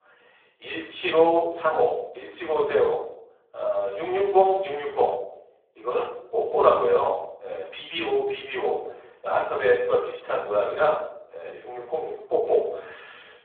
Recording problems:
phone-call audio; poor line; nothing above 3.5 kHz
off-mic speech; far
room echo; noticeable; dies away in 0.6 s

